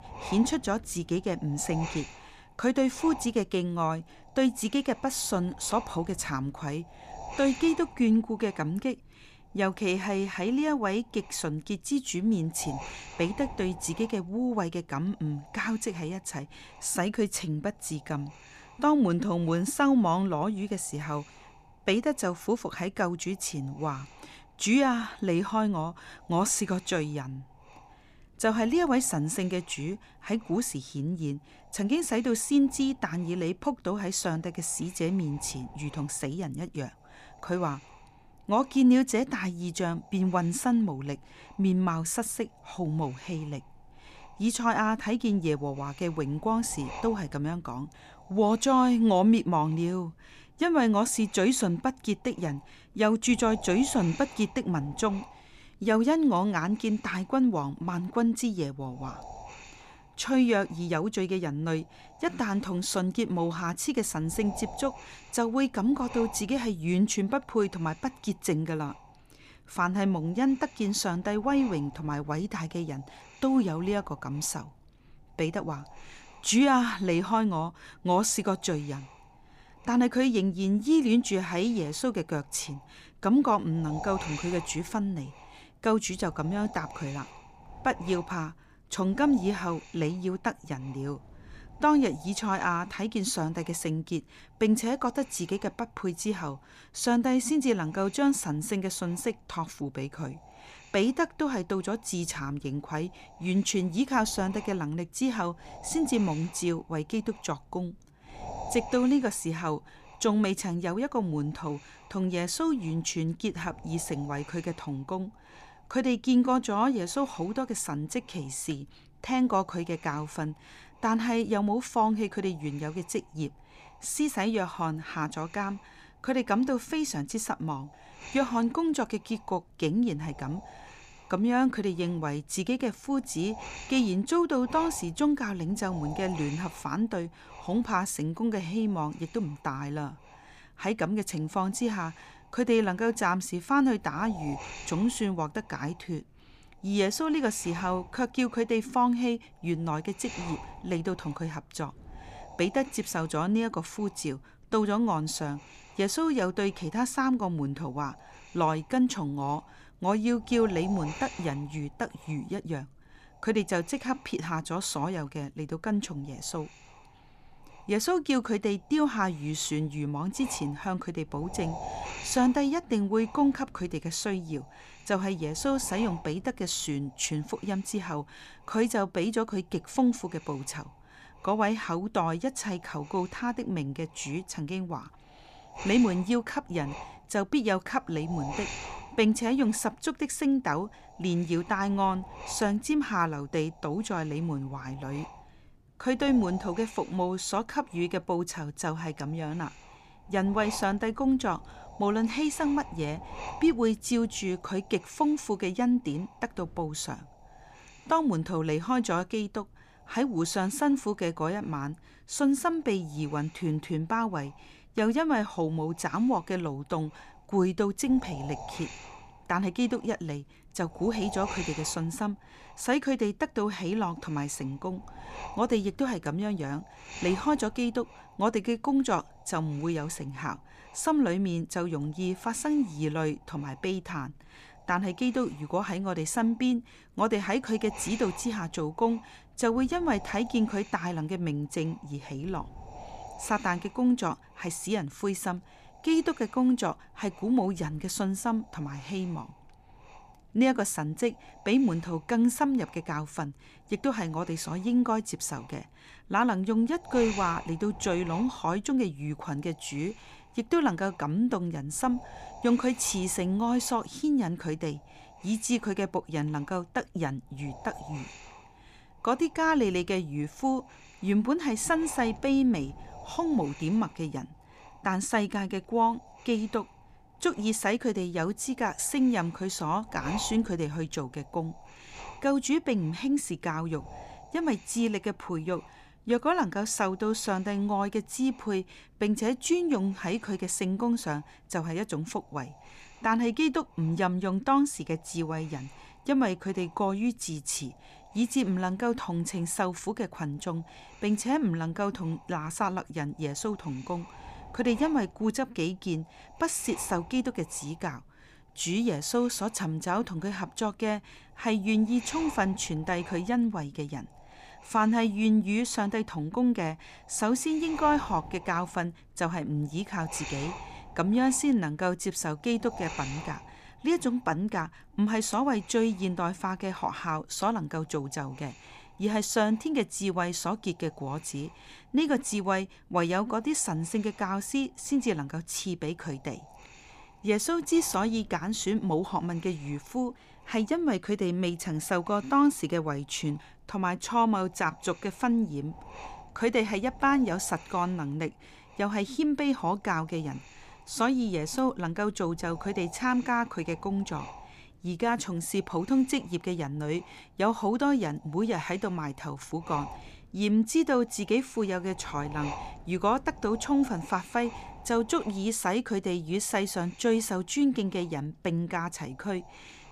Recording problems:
wind noise on the microphone; occasional gusts; 15 dB below the speech

